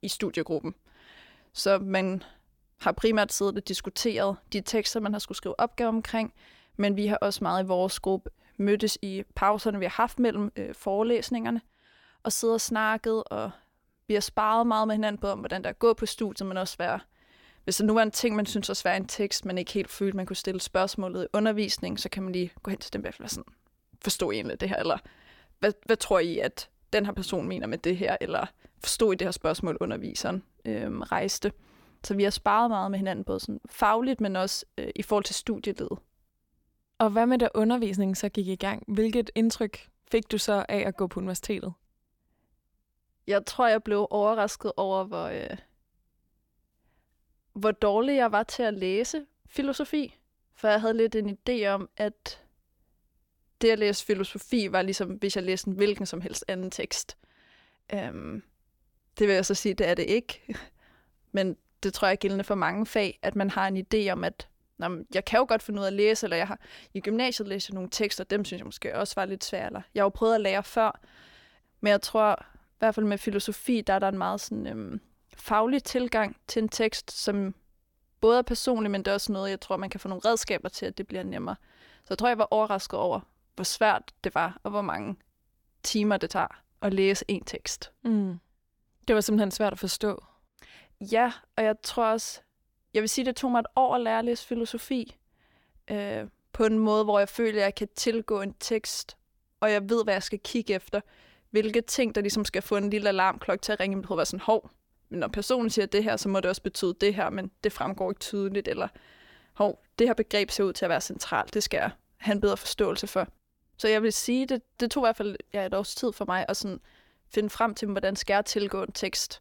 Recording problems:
none

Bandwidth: 17.5 kHz